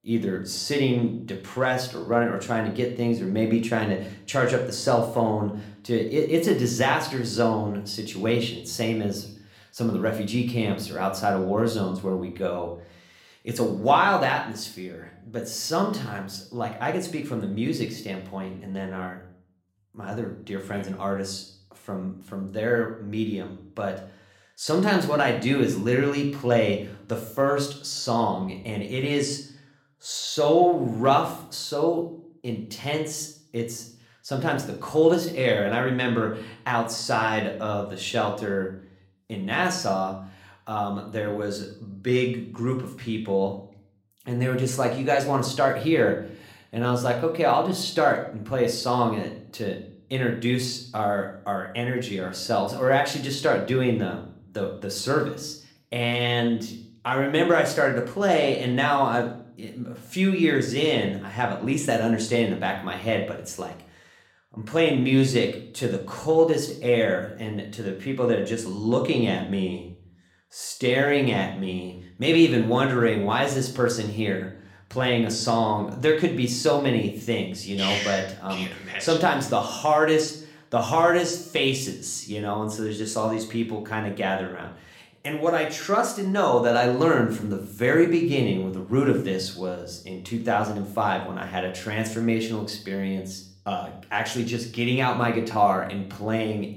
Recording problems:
room echo; slight; dies away in 0.5 s
off-mic speech; somewhat distant

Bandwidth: 16.5 kHz